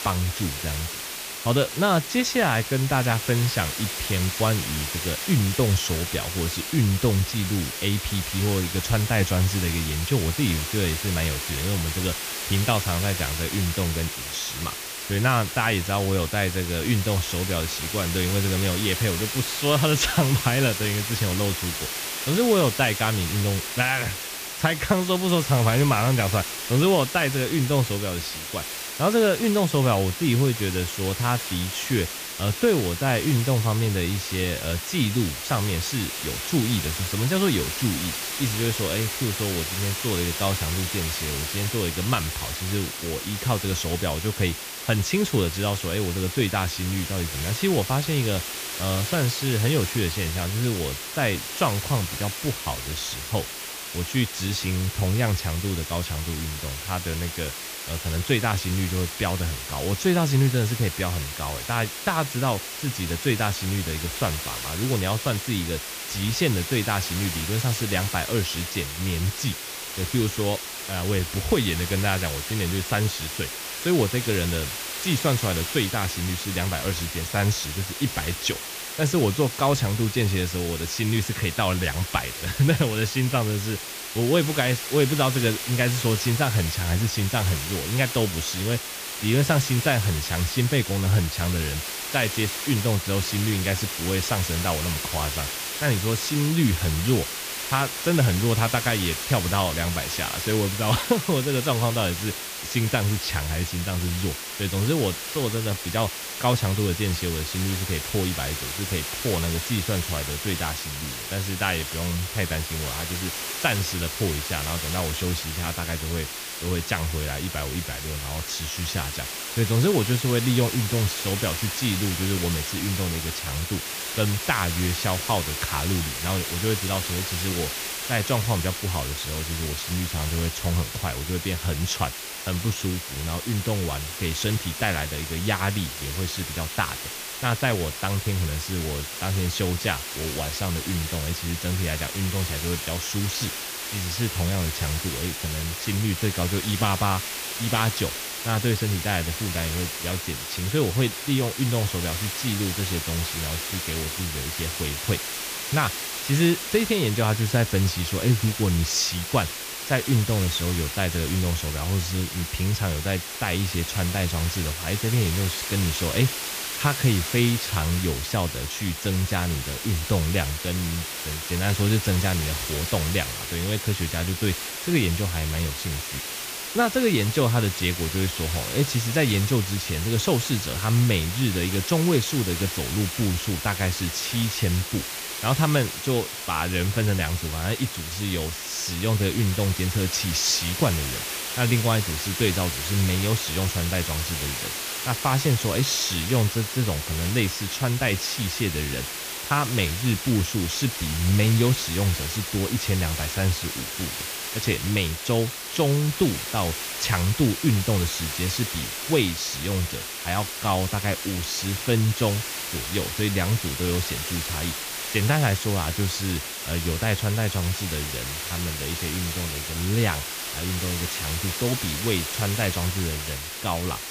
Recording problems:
hiss; loud; throughout; 4 dB below the speech

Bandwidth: 15 kHz